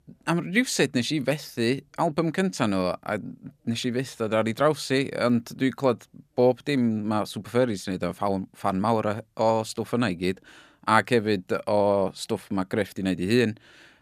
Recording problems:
none

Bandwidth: 14.5 kHz